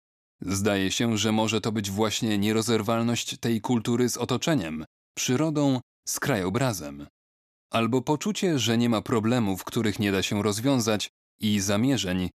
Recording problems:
none

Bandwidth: 14 kHz